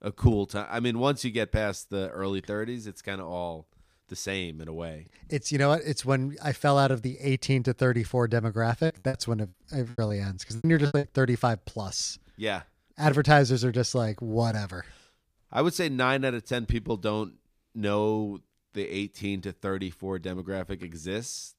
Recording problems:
choppy; very; from 9 to 11 s; 21% of the speech affected

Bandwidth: 15 kHz